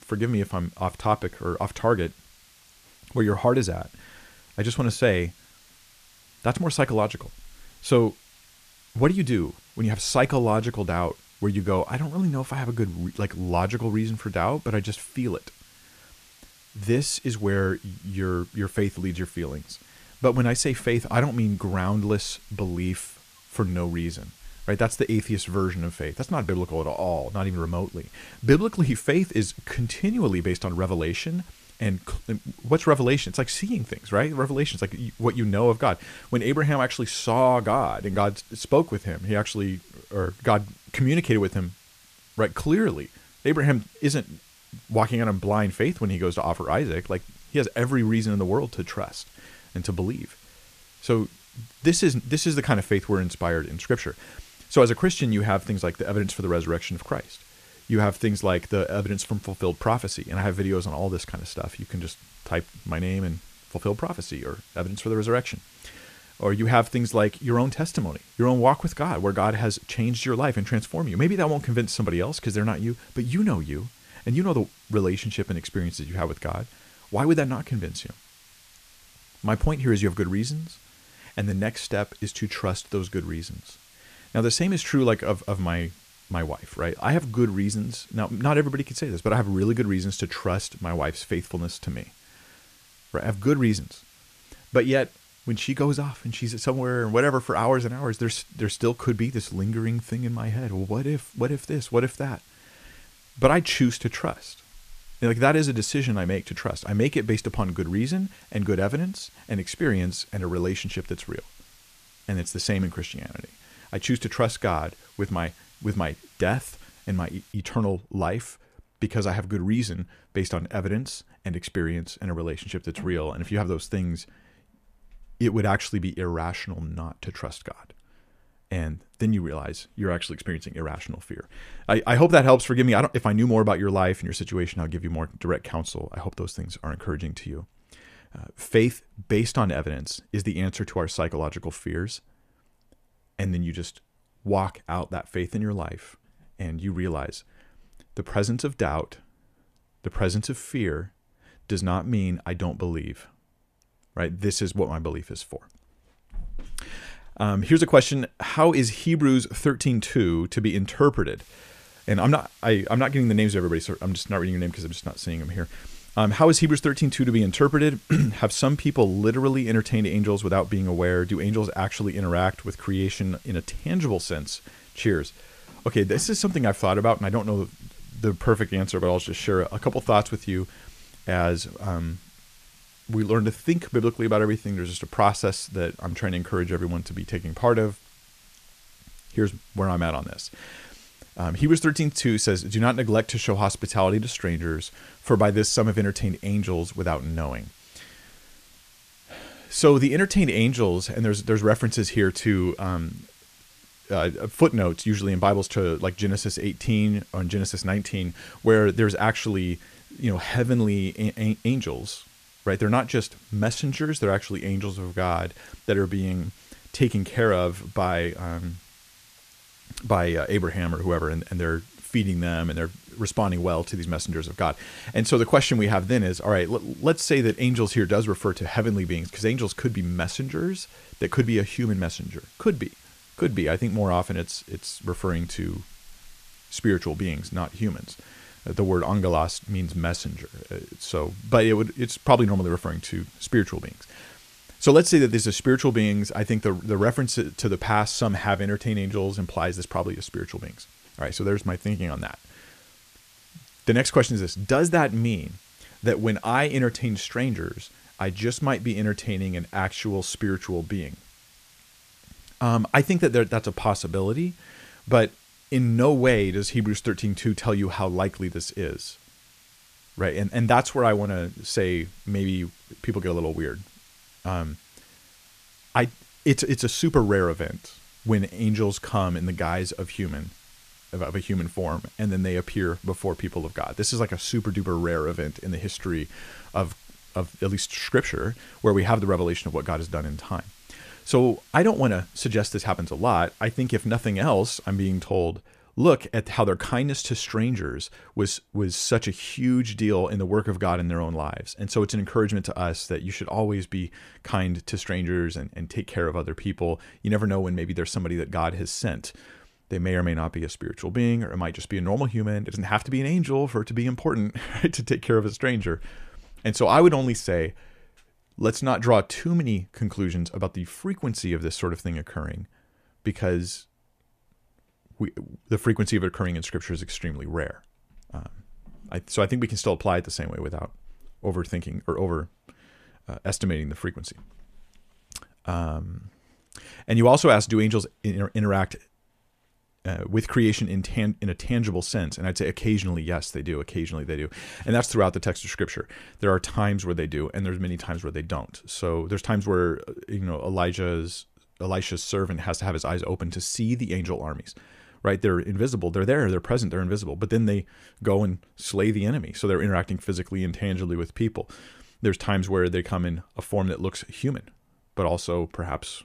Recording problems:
hiss; faint; until 1:58 and from 2:41 to 4:55; 25 dB below the speech

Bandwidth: 14.5 kHz